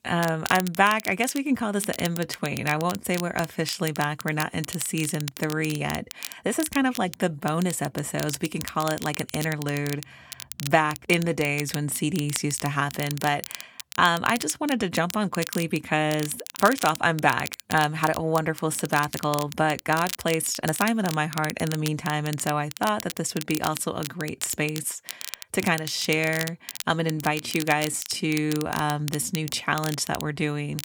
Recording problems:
crackle, like an old record; noticeable; 10 dB below the speech
uneven, jittery; strongly; from 2 to 29 s

